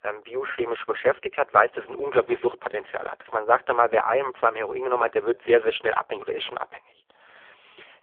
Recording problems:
phone-call audio; poor line; nothing above 3.5 kHz

